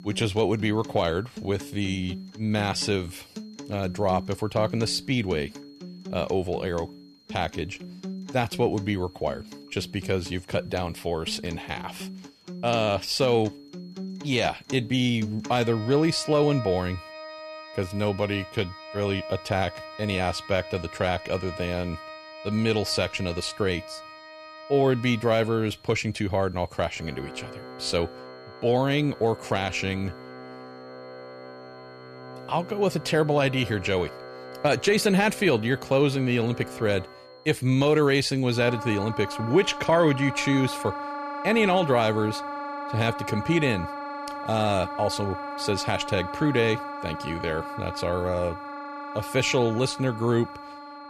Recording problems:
background music; noticeable; throughout; 10 dB below the speech
high-pitched whine; faint; throughout; 4.5 kHz, 30 dB below the speech

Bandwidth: 14 kHz